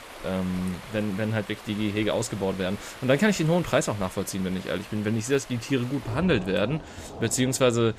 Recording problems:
rain or running water; noticeable; throughout; 15 dB below the speech

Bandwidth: 14.5 kHz